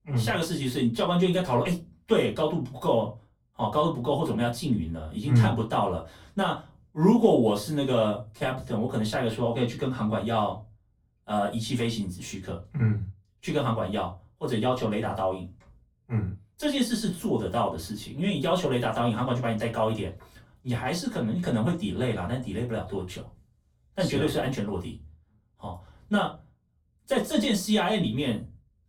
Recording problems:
off-mic speech; far
room echo; very slight; dies away in 0.2 s

